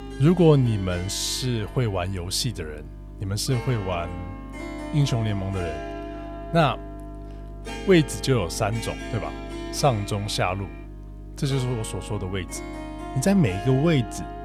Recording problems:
background music; noticeable; throughout; 15 dB below the speech
electrical hum; faint; throughout; 50 Hz, 25 dB below the speech

